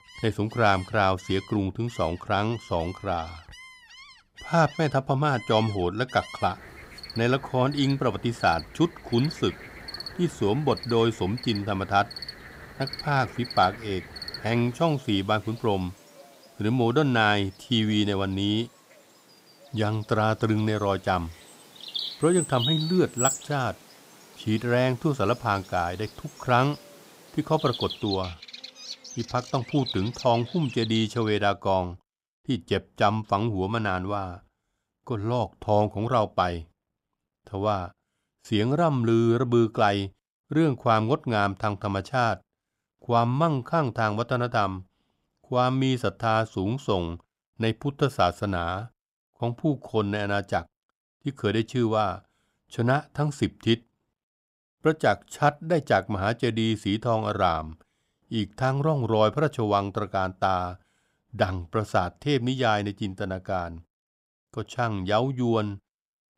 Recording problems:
animal sounds; noticeable; until 31 s; 10 dB below the speech

